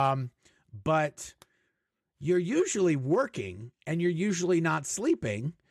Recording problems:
abrupt cut into speech; at the start

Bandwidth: 14.5 kHz